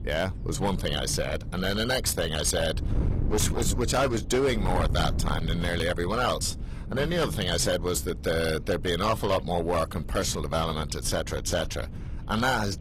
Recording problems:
distortion; slight; 9% of the sound clipped
garbled, watery; slightly; nothing above 14.5 kHz
animal sounds; noticeable; throughout; 15 dB below the speech
wind noise on the microphone; occasional gusts; 15 dB below the speech

